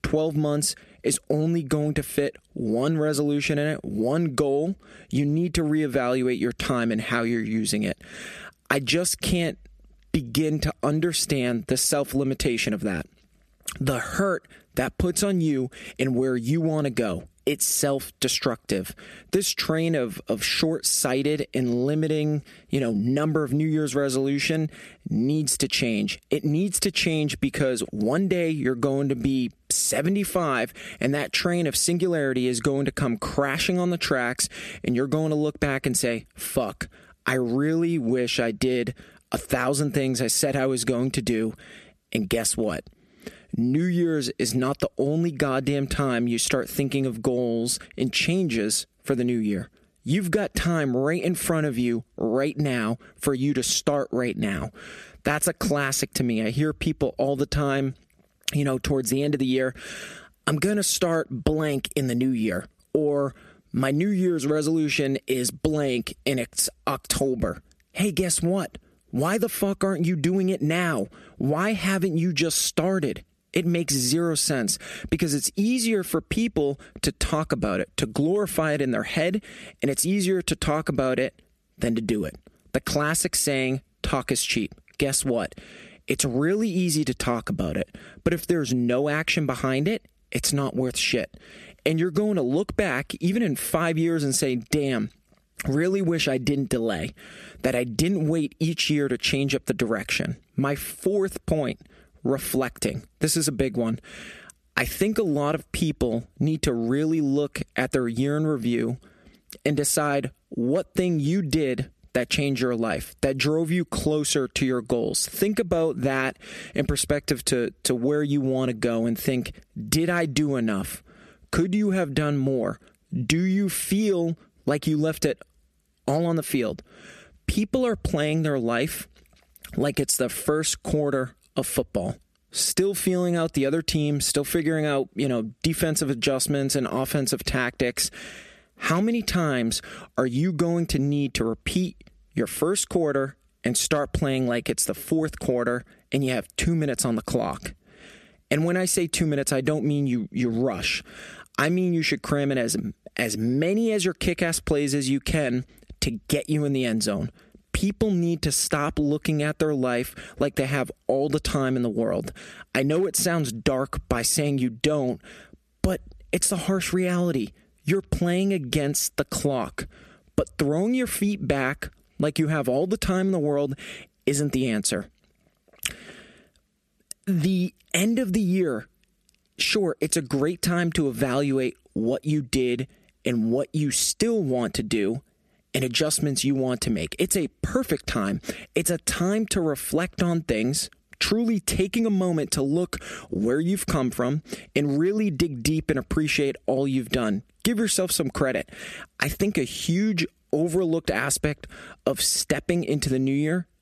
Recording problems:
squashed, flat; heavily

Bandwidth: 13.5 kHz